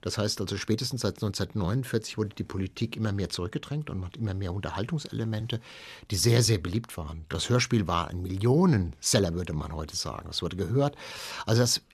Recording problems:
uneven, jittery; strongly; from 0.5 to 11 s

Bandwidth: 13.5 kHz